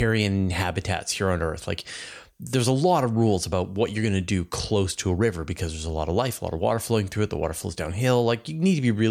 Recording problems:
abrupt cut into speech; at the start and the end

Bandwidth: 19 kHz